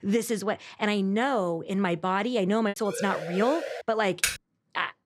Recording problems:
choppy; occasionally; 2% of the speech affected
siren; noticeable; at 3 s; peak 6 dB below the speech
keyboard typing; noticeable; at 4 s; peak level with the speech

